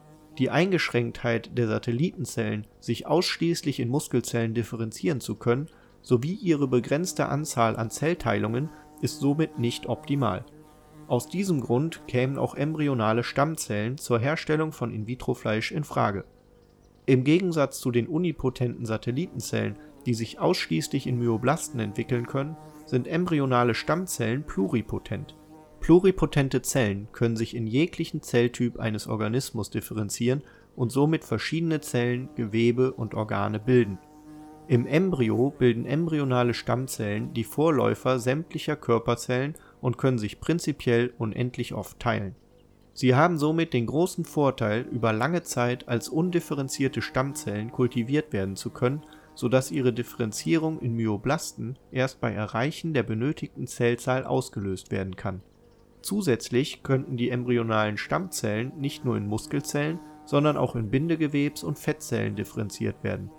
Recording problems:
electrical hum; faint; throughout; 50 Hz, 25 dB below the speech

